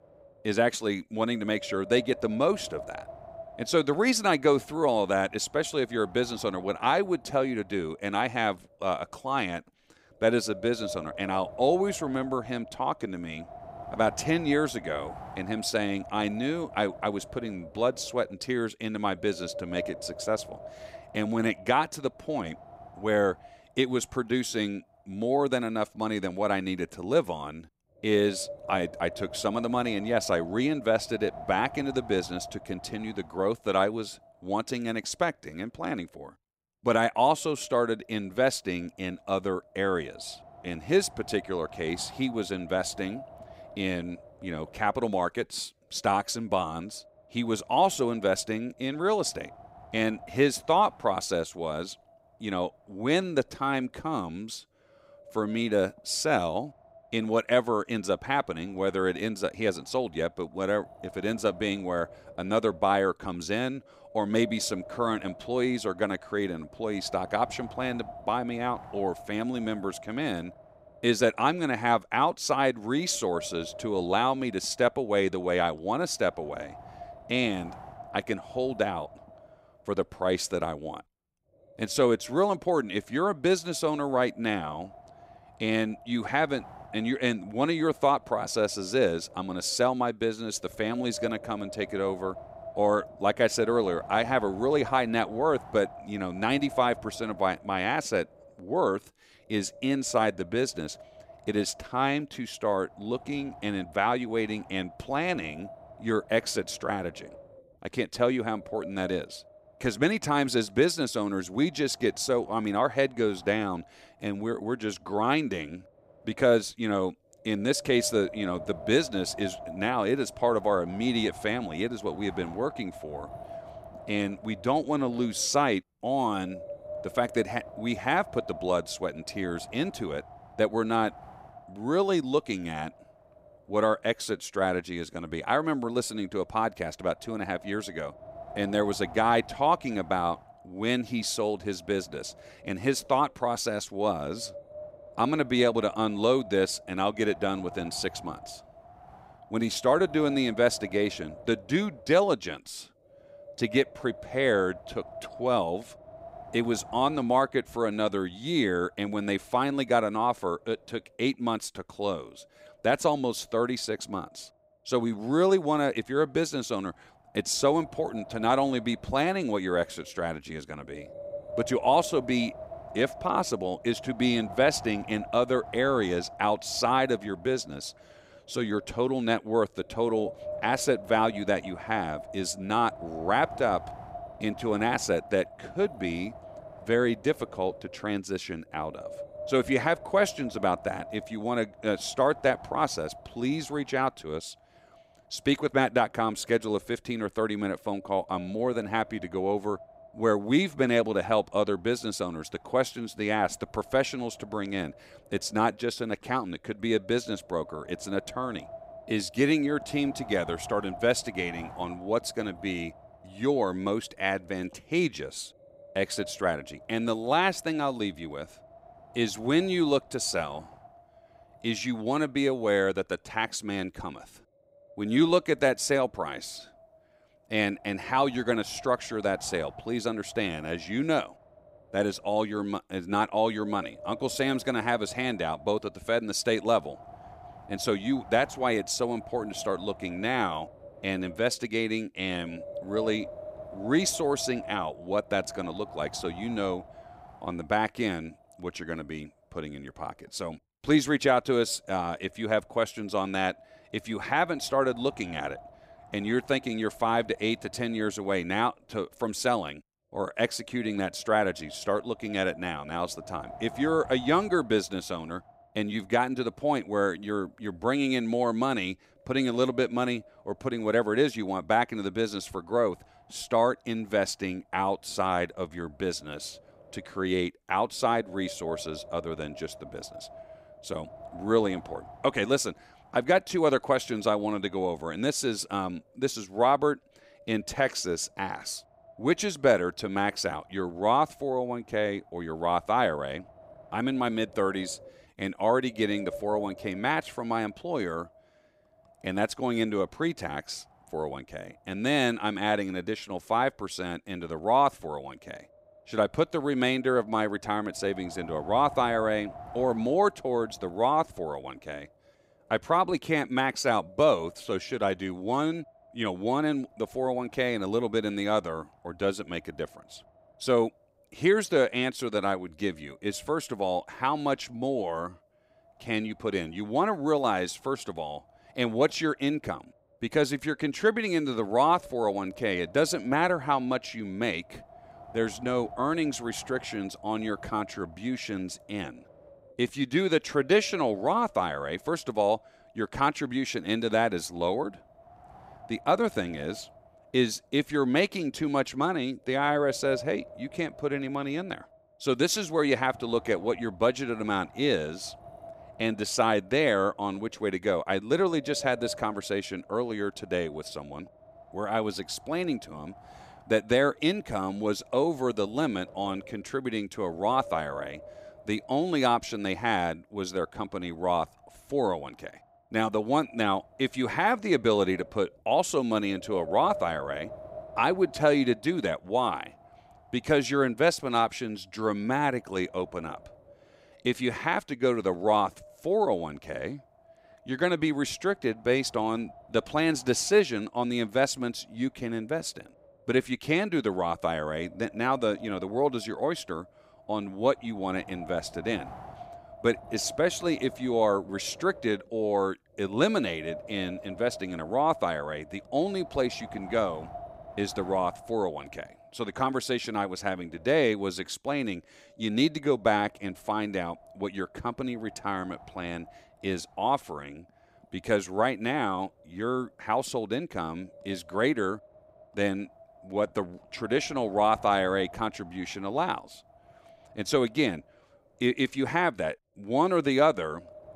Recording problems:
wind noise on the microphone; occasional gusts; 15 dB below the speech

